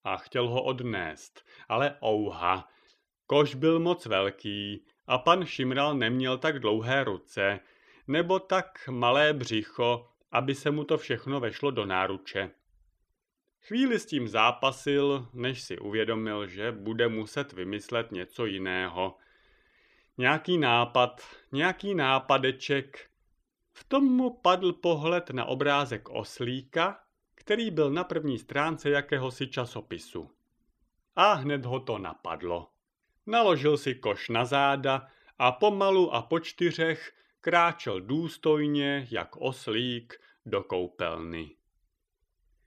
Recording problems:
none

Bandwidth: 14.5 kHz